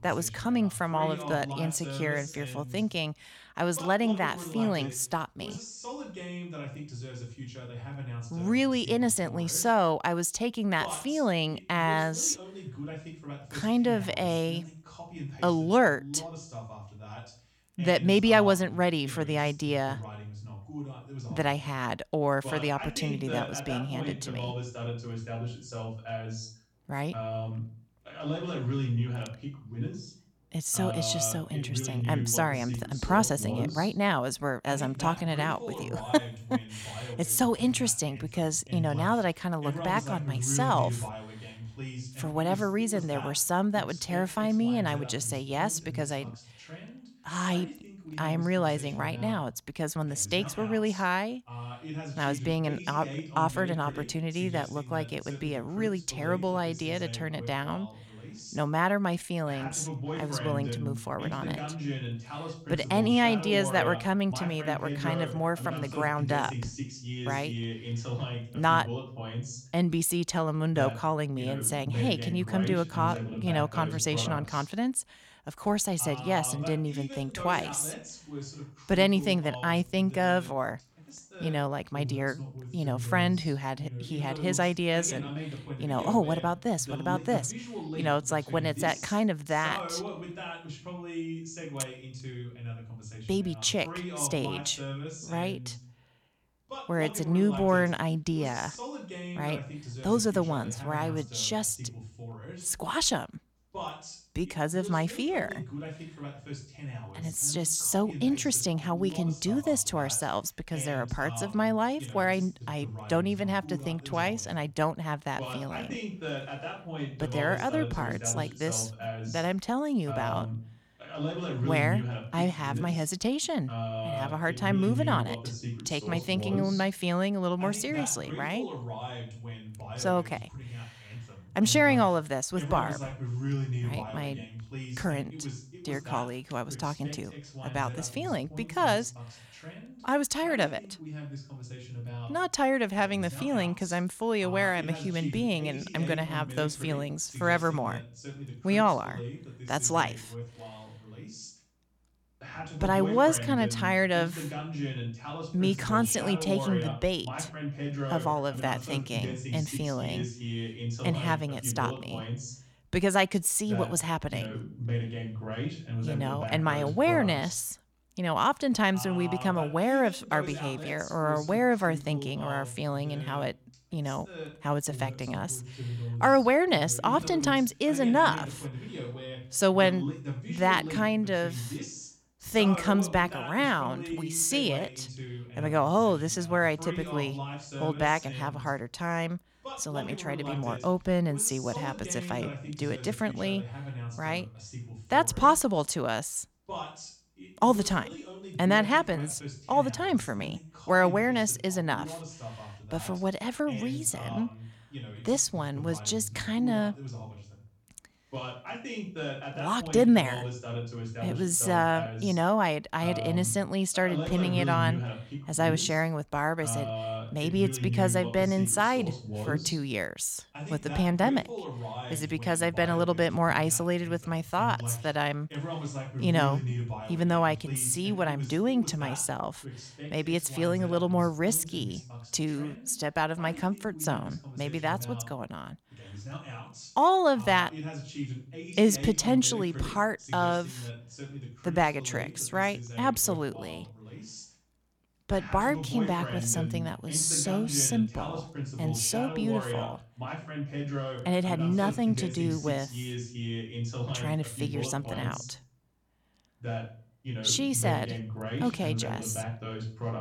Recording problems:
voice in the background; loud; throughout; 9 dB below the speech

